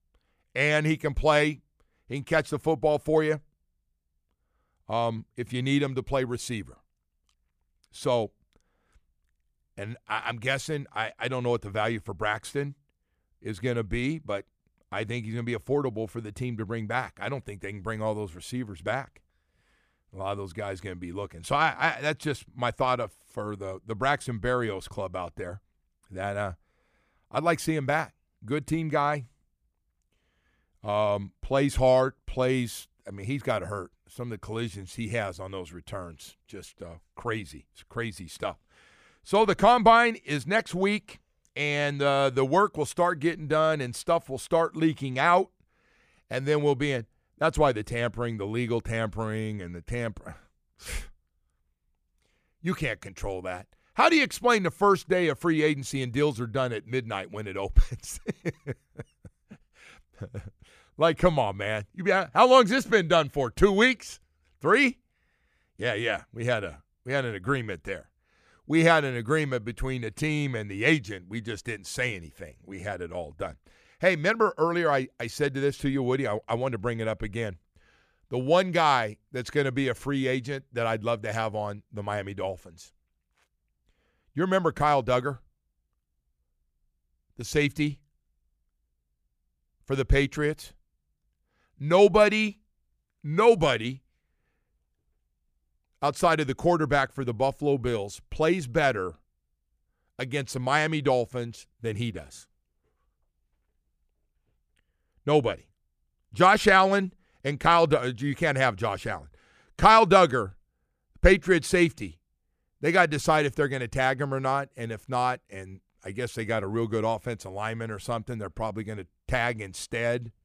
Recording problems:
none

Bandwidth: 15 kHz